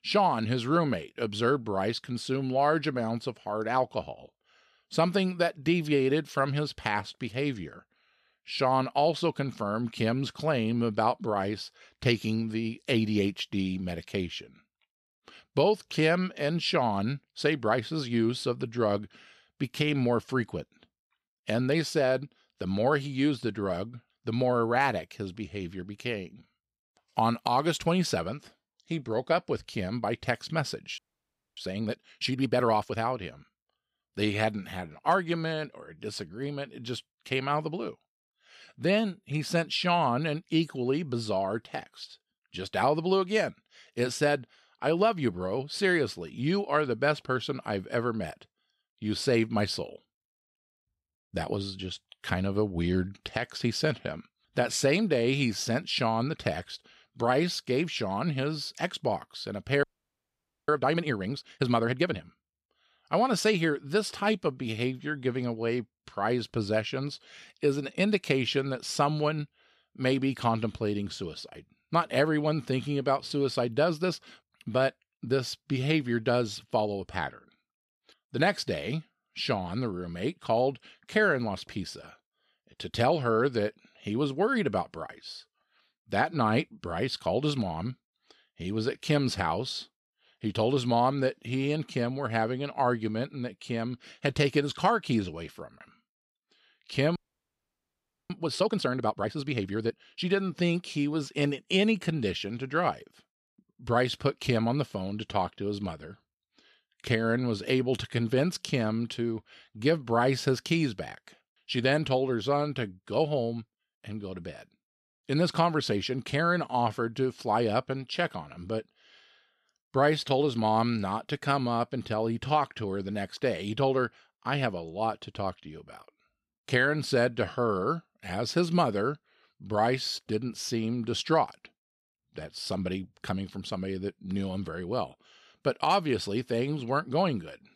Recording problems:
audio freezing; at 31 s for 0.5 s, at 1:00 for 1 s and at 1:37 for 1 s

